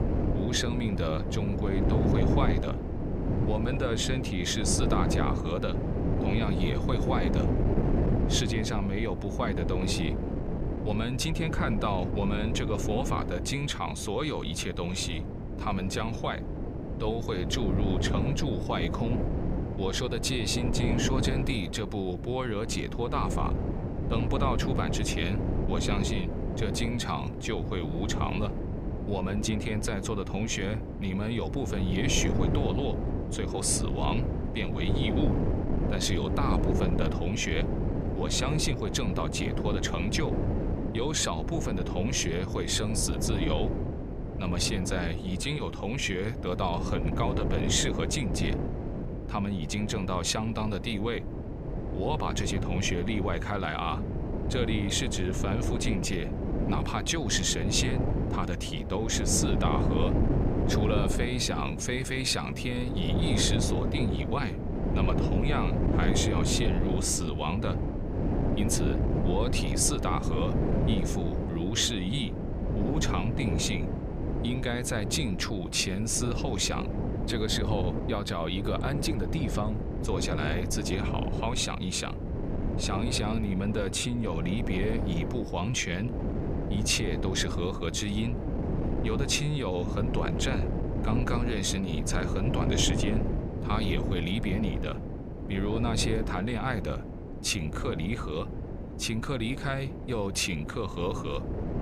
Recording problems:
wind noise on the microphone; heavy; 5 dB below the speech

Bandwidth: 14.5 kHz